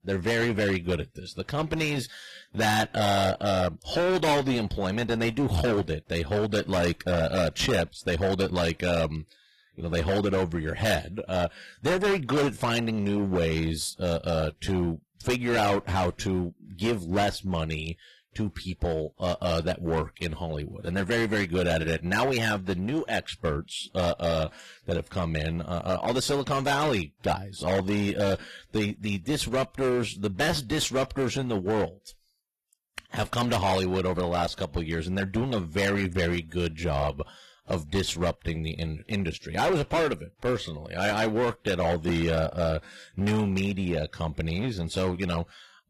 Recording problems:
distortion; heavy; 16% of the sound clipped
garbled, watery; slightly; nothing above 15.5 kHz

